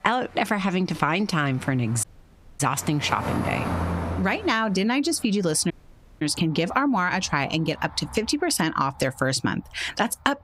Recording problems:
squashed, flat; heavily, background pumping
traffic noise; loud; throughout; 9 dB below the speech
audio cutting out; at 2 s for 0.5 s and at 5.5 s for 0.5 s

